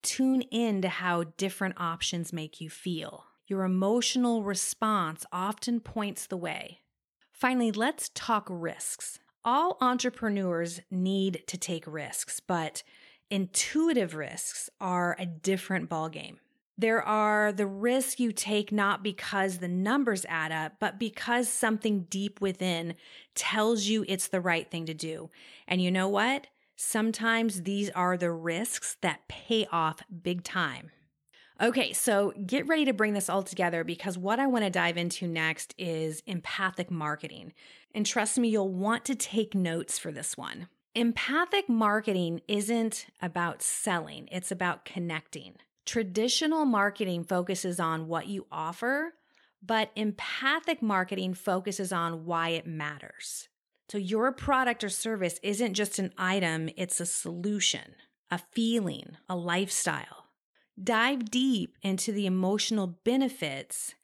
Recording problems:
none

